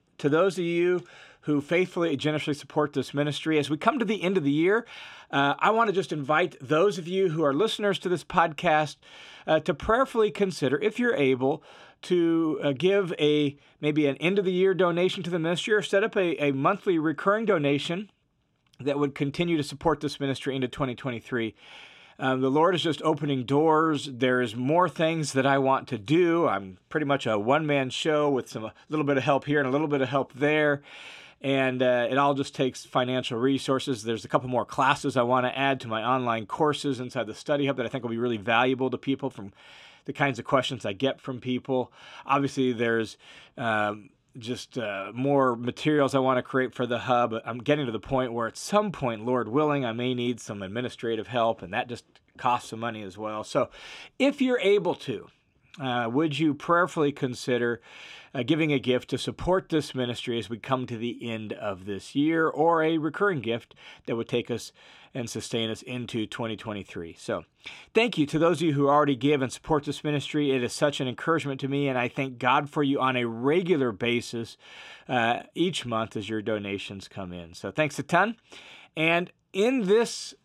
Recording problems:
none

